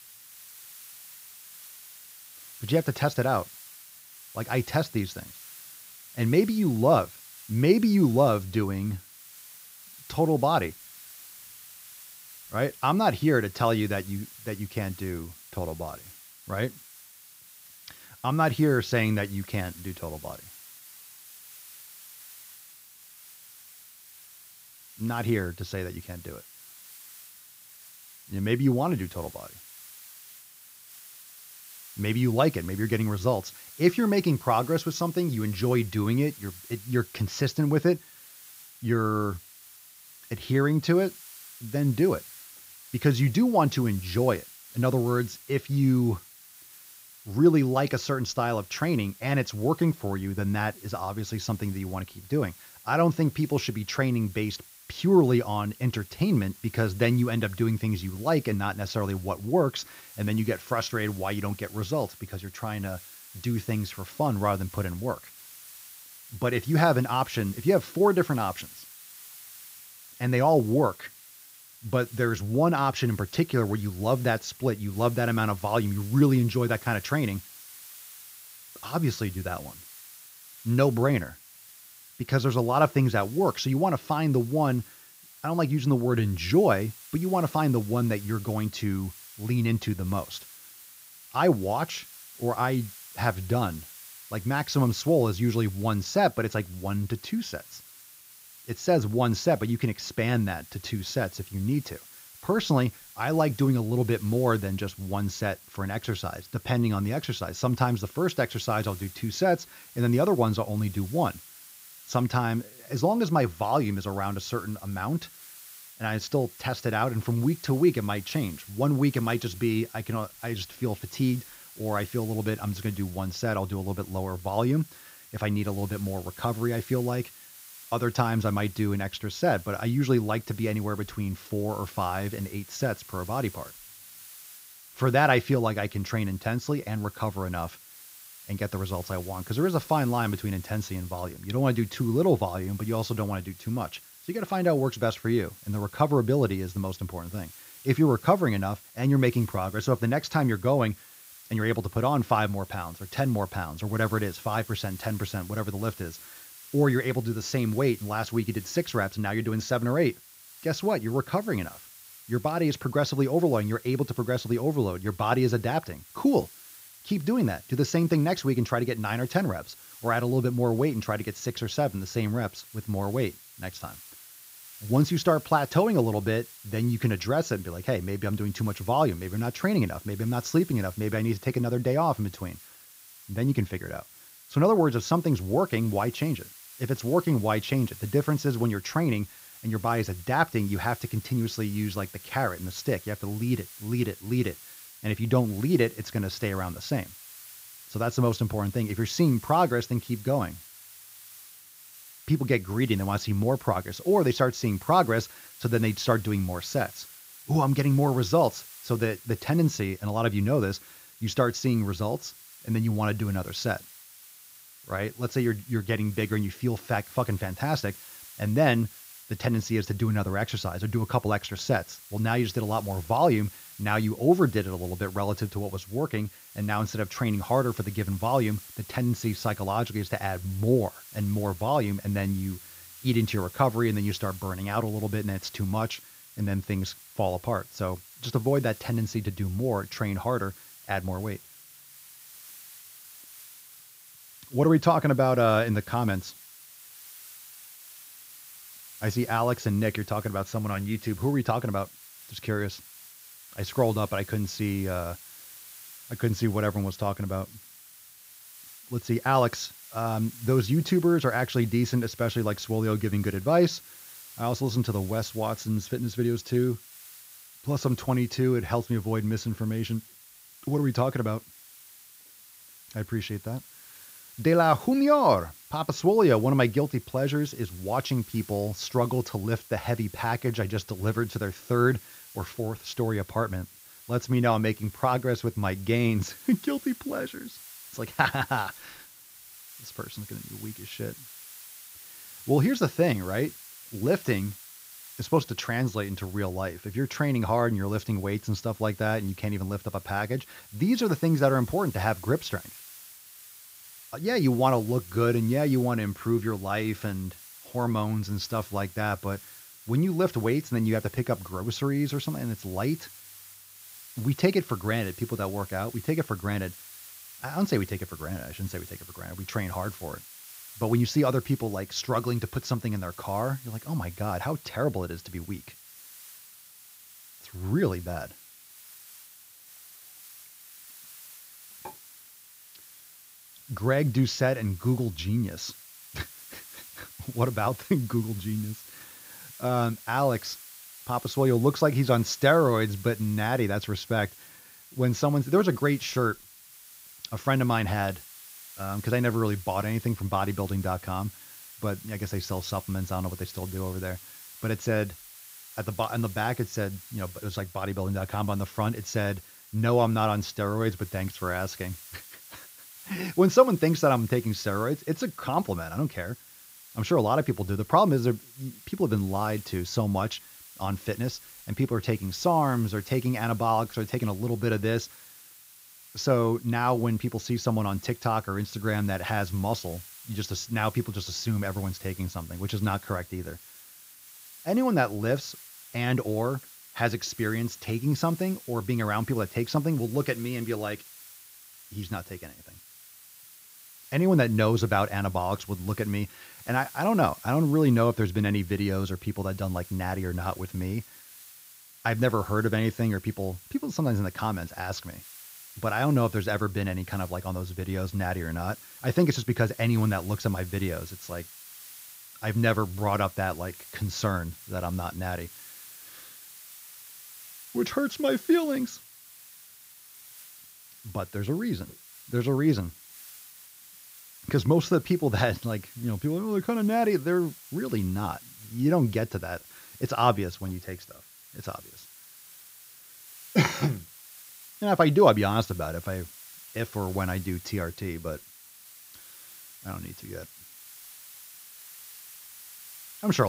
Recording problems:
high frequencies cut off; noticeable; nothing above 7 kHz
hiss; noticeable; throughout; 20 dB below the speech
abrupt cut into speech; at the end

